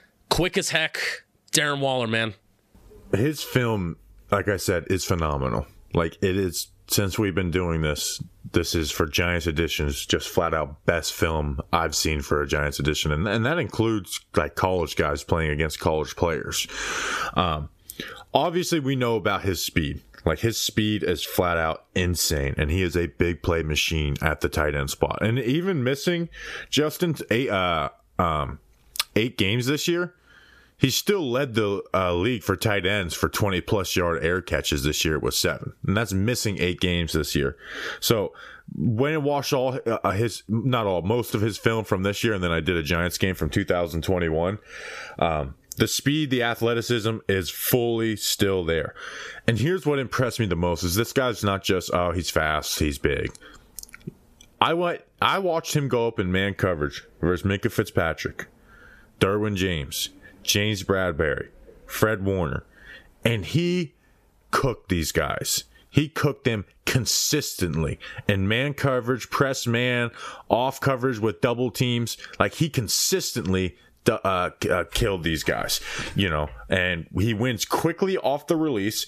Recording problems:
squashed, flat; somewhat

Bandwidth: 14.5 kHz